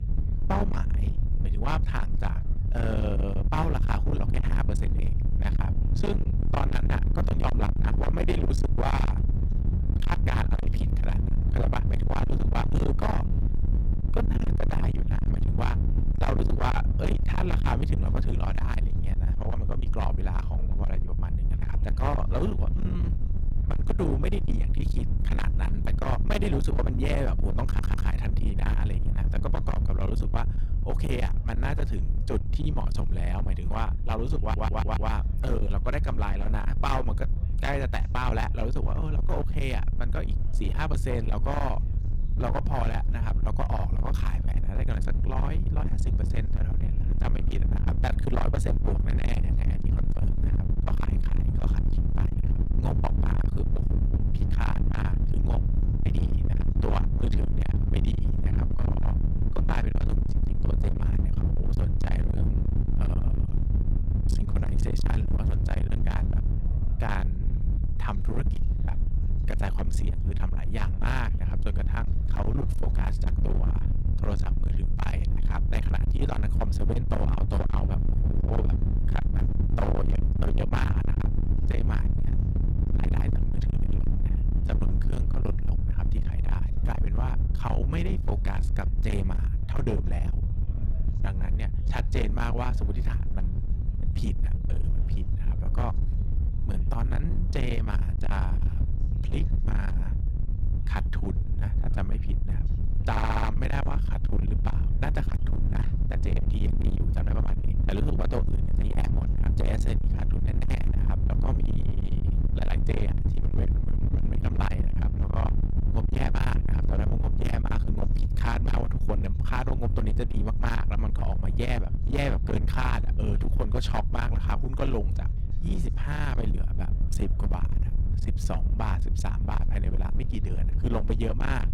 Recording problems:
distortion; heavy; 45% of the sound clipped
low rumble; loud; throughout; 5 dB below the speech
background chatter; faint; throughout; 4 voices, 25 dB below the speech
audio stuttering; at 28 s, at 34 s and at 1:43

